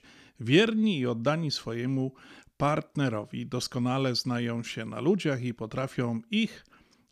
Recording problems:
none

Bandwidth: 15 kHz